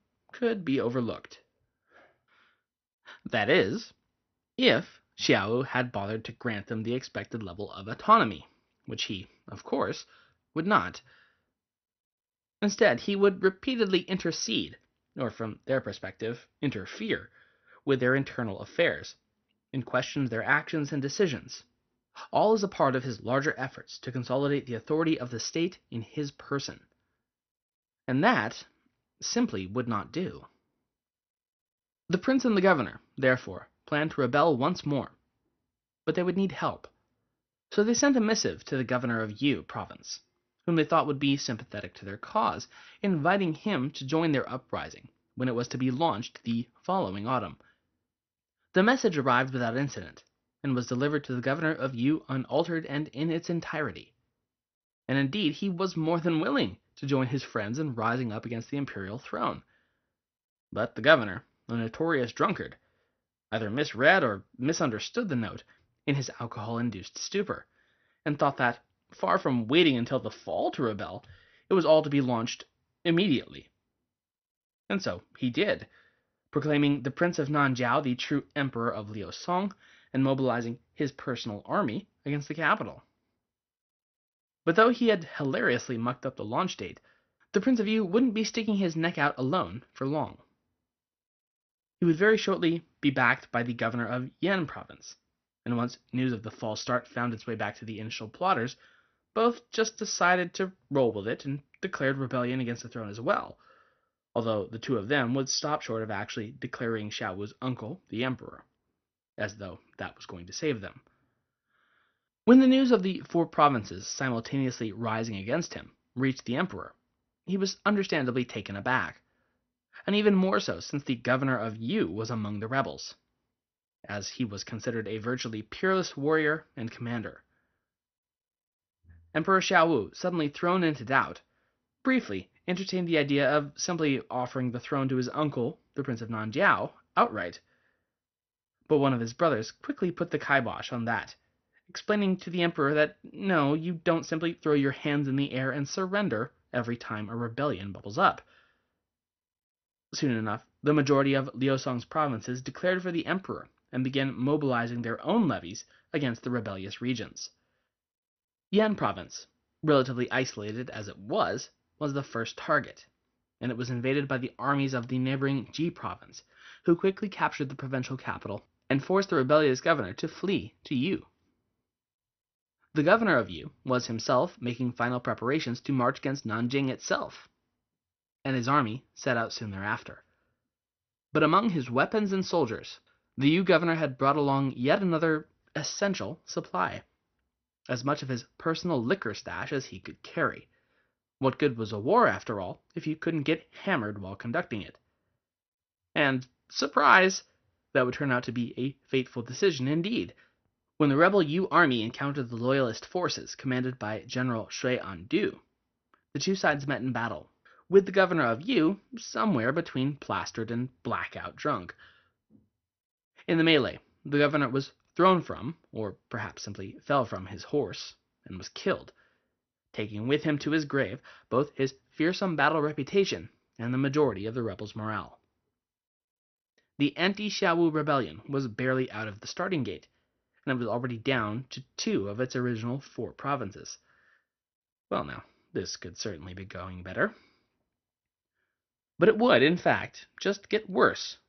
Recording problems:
garbled, watery; slightly; nothing above 6 kHz

